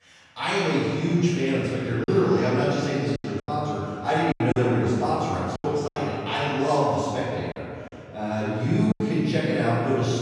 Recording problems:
room echo; strong; dies away in 2.3 s
off-mic speech; far
choppy; very; from 2 to 6 s and from 7.5 to 9 s; 11% of the speech affected

